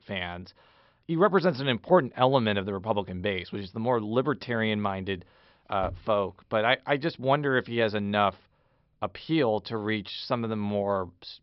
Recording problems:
high frequencies cut off; noticeable; nothing above 5.5 kHz

